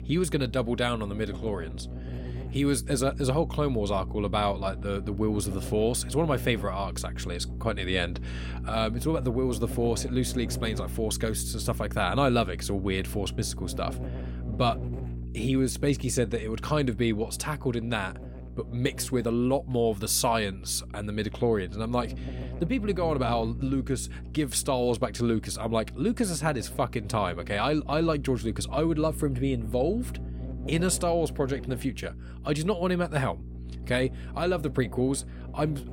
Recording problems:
electrical hum; noticeable; throughout; 60 Hz, 20 dB below the speech

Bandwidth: 16.5 kHz